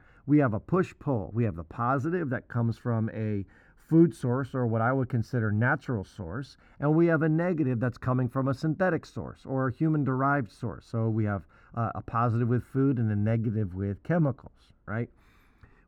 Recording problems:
muffled; very; fading above 2.5 kHz

